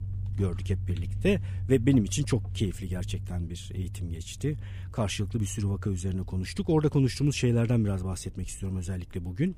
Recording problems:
low rumble; noticeable; throughout; 20 dB below the speech

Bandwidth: 15 kHz